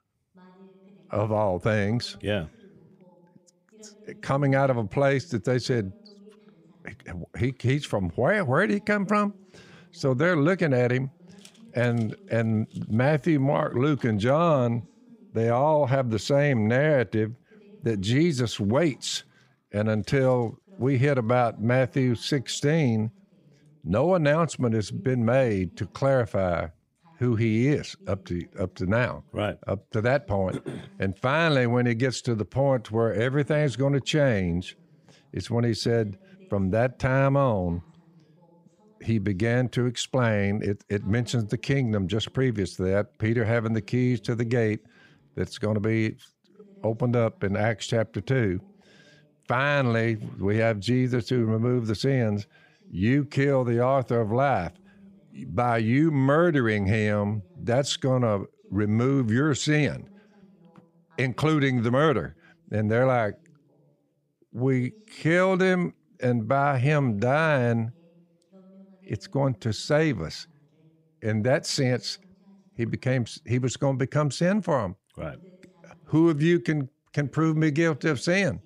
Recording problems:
voice in the background; faint; throughout; 30 dB below the speech

